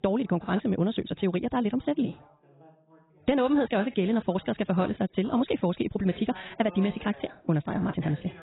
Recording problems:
garbled, watery; badly; nothing above 4 kHz
wrong speed, natural pitch; too fast; 1.6 times normal speed
background chatter; faint; throughout; 2 voices, 25 dB below the speech

